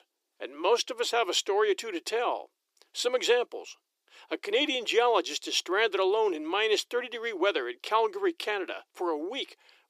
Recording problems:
thin; very; fading below 350 Hz

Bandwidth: 15 kHz